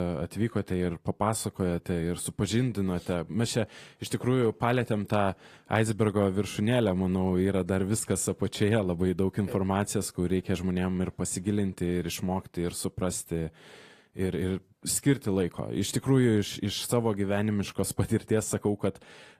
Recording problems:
garbled, watery; slightly; nothing above 14.5 kHz
abrupt cut into speech; at the start

